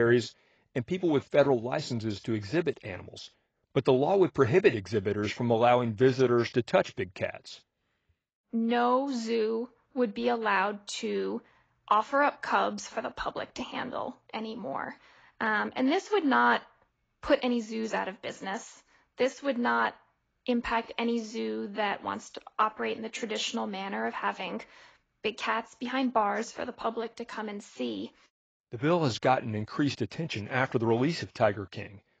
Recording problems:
garbled, watery; badly; nothing above 7.5 kHz
abrupt cut into speech; at the start

